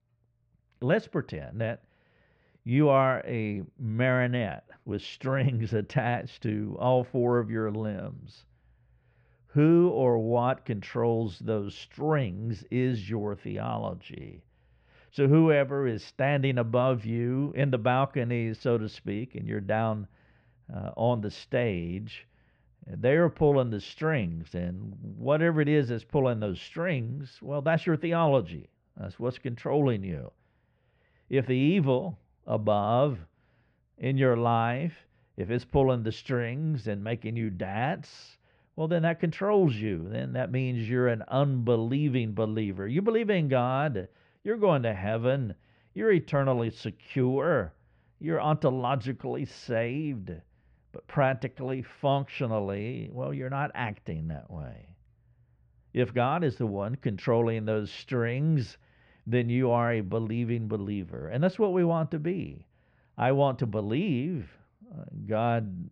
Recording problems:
muffled; very; fading above 1.5 kHz

